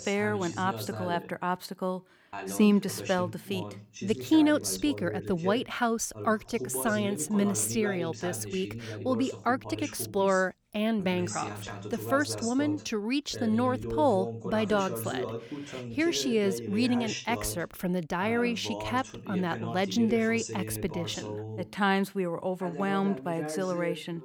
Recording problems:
voice in the background; loud; throughout; 9 dB below the speech

